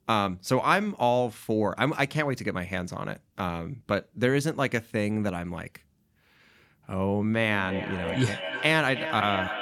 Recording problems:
echo of what is said; strong; from 7.5 s on; 310 ms later, 7 dB below the speech

